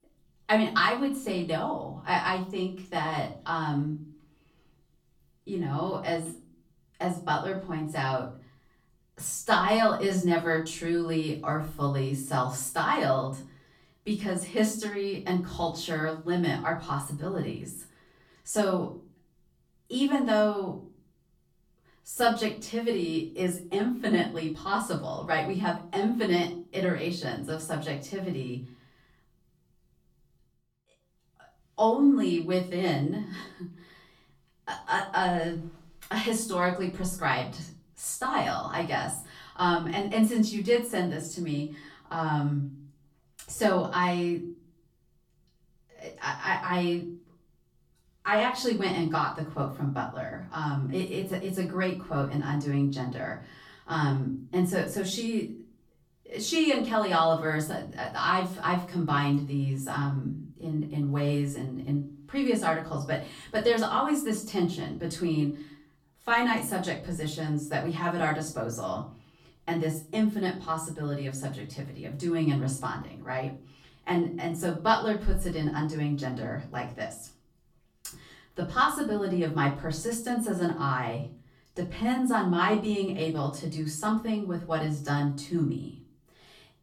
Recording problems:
off-mic speech; far
room echo; slight; dies away in 0.4 s

